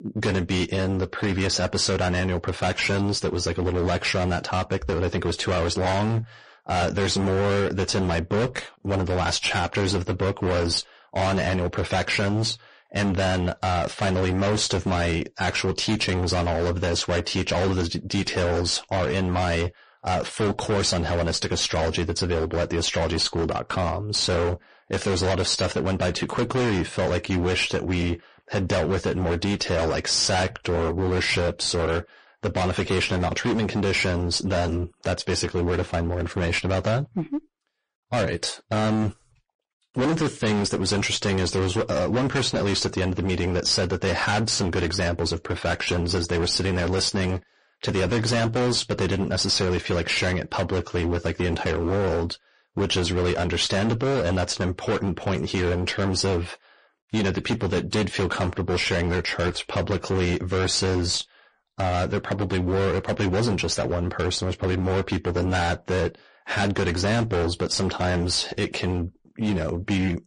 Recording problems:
distortion; heavy; 27% of the sound clipped
garbled, watery; slightly; nothing above 10 kHz

